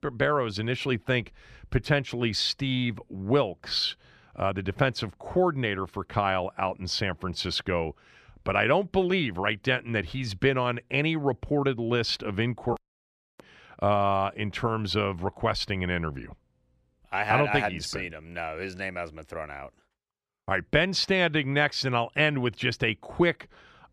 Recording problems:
none

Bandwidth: 14 kHz